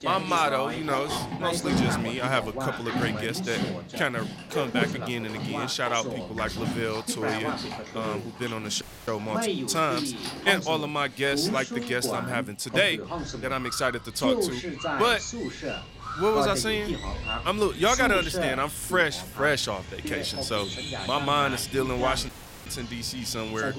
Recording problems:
animal sounds; loud; throughout; 8 dB below the speech
voice in the background; loud; throughout; 6 dB below the speech
audio cutting out; at 9 s and at 22 s

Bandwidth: 16 kHz